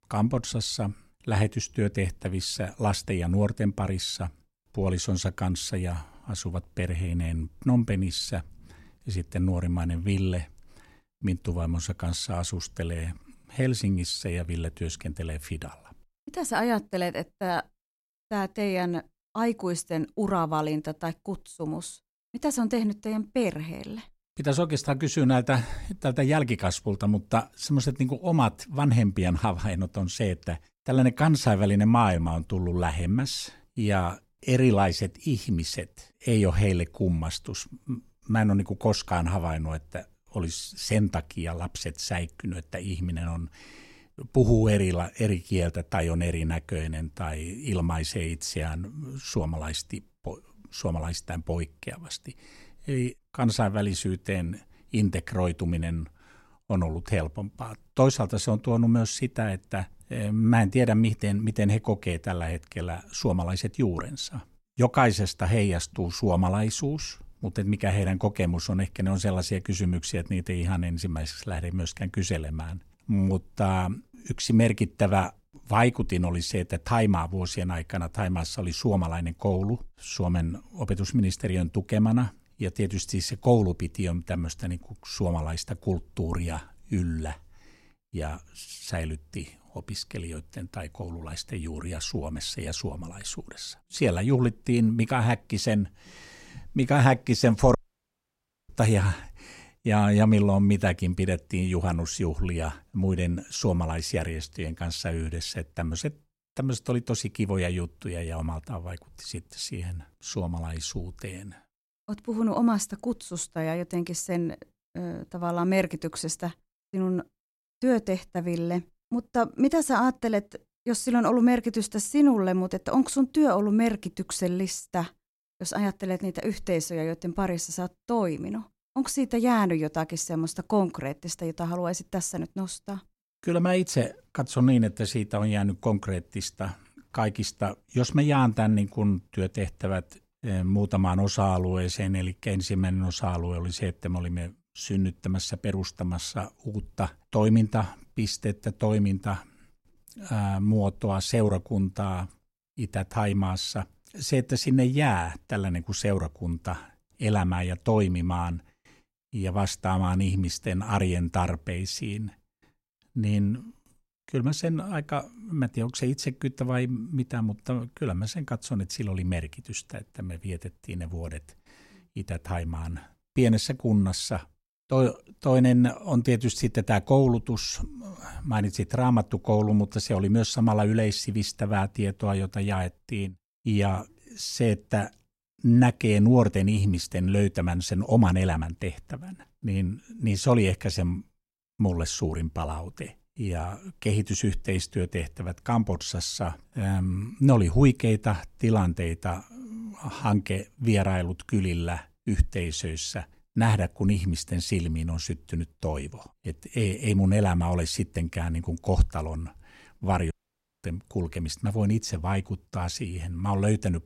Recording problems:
audio cutting out; at 1:38 for 1 s and at 3:30 for 0.5 s

